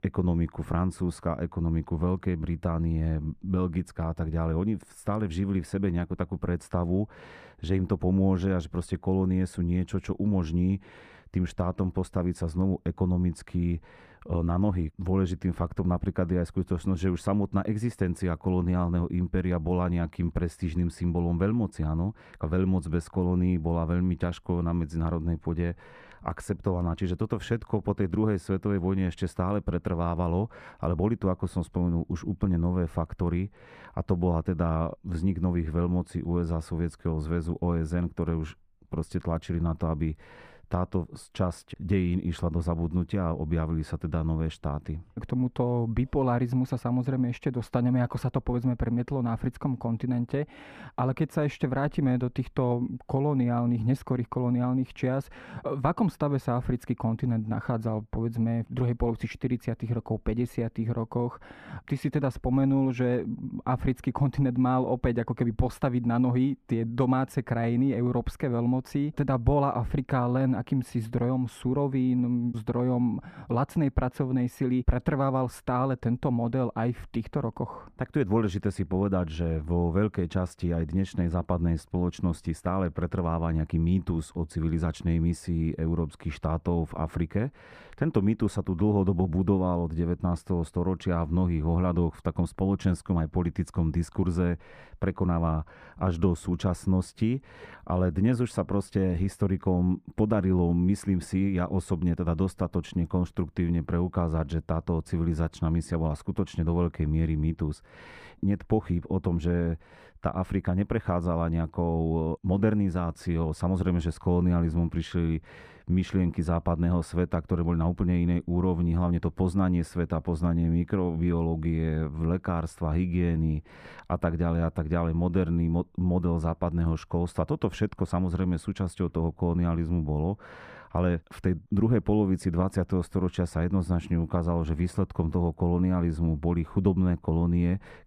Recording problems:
muffled; very; fading above 2.5 kHz

